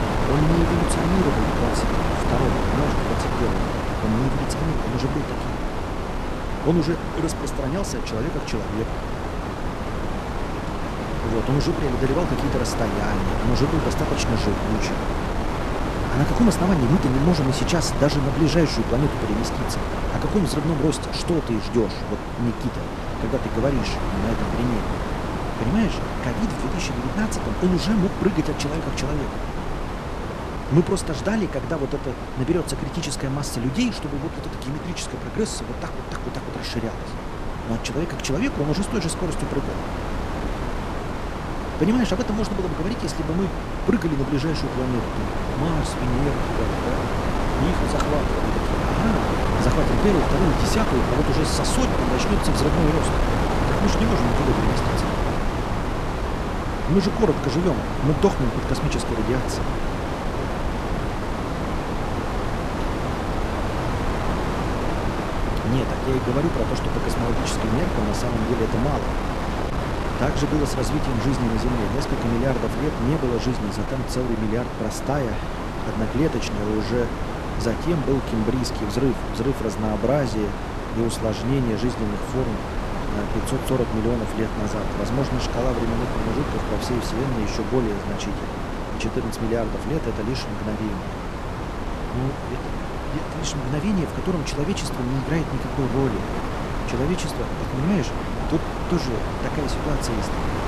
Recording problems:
wind noise on the microphone; heavy; 1 dB above the speech

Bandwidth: 13.5 kHz